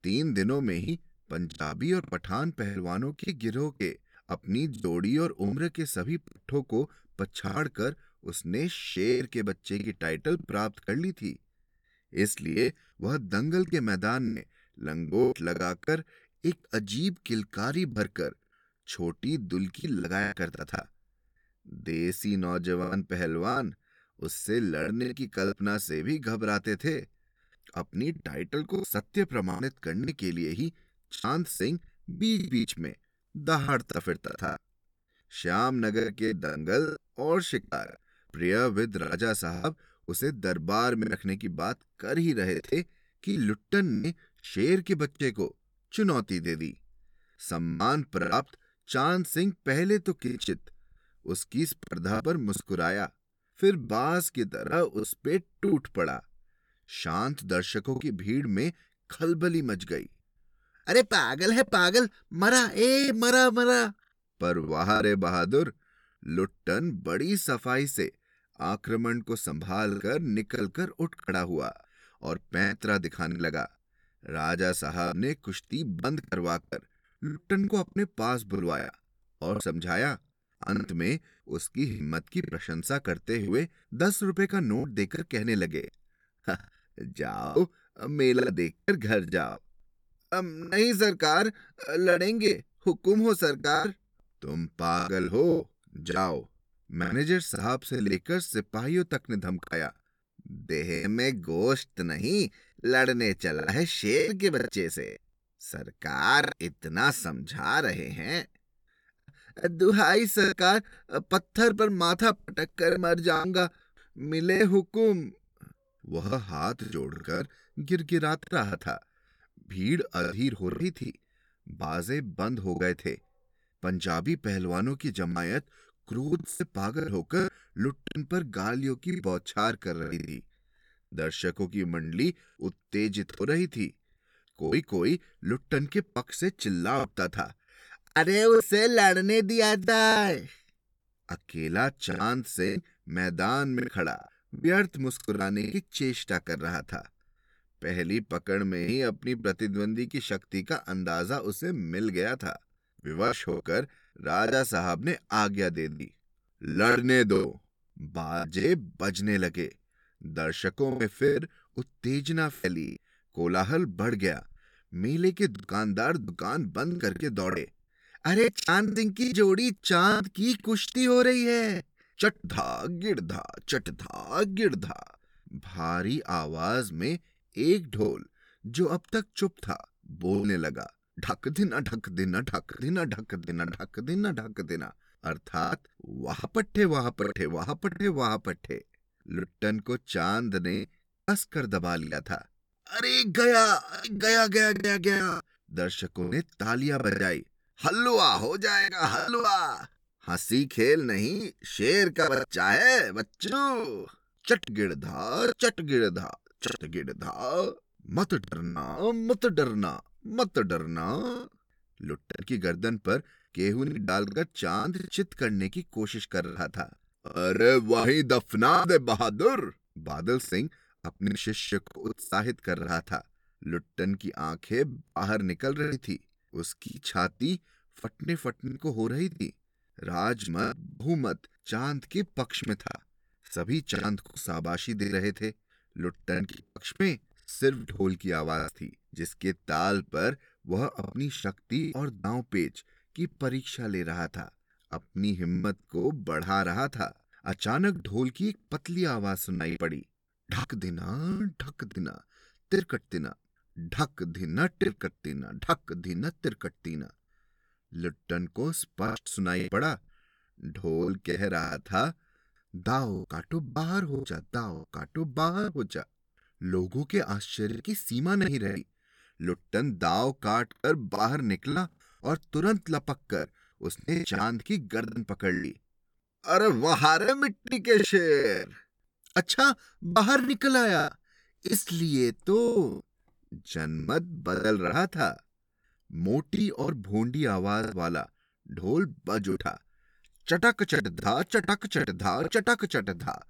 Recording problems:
choppy; very; 9% of the speech affected

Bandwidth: 18.5 kHz